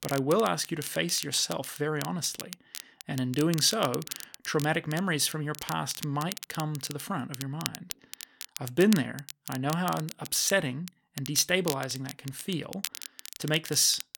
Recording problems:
crackle, like an old record; noticeable; 10 dB below the speech

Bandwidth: 17.5 kHz